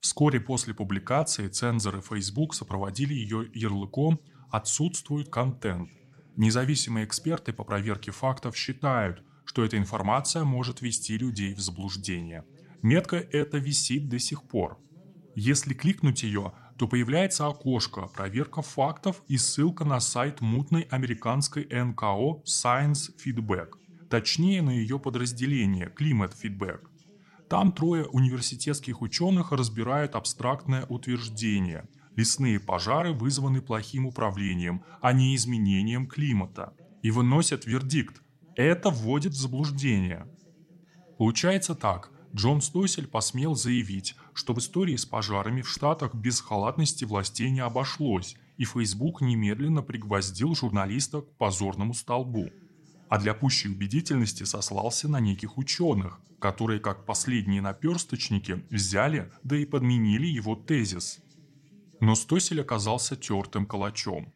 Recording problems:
voice in the background; faint; throughout; 30 dB below the speech

